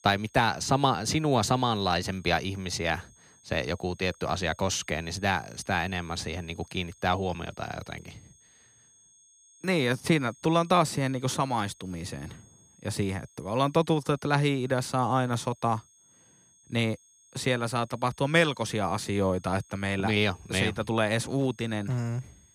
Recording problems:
high-pitched whine; faint; throughout; 6.5 kHz, 30 dB below the speech

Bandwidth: 15 kHz